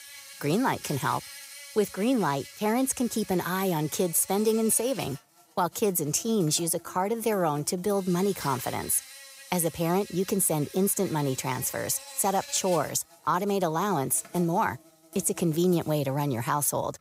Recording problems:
animal sounds; noticeable; throughout; 15 dB below the speech

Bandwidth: 15.5 kHz